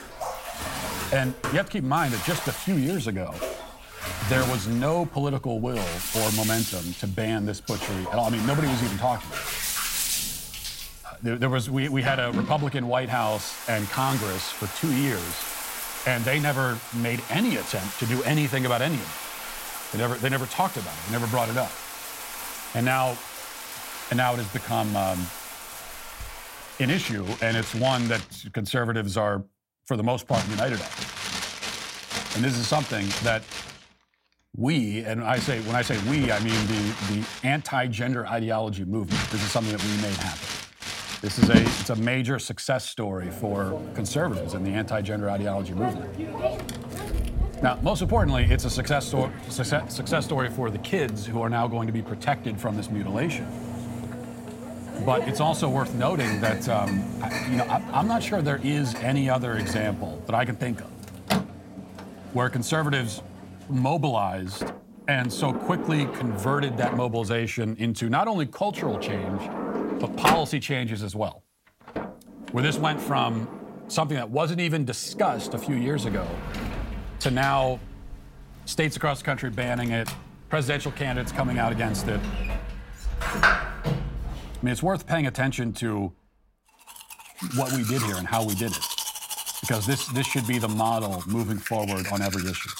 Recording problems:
household noises; loud; throughout; 5 dB below the speech

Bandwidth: 16 kHz